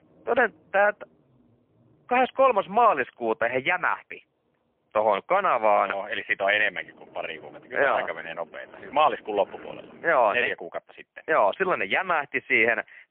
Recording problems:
phone-call audio; poor line; nothing above 3 kHz
traffic noise; faint; until 10 s; 25 dB below the speech

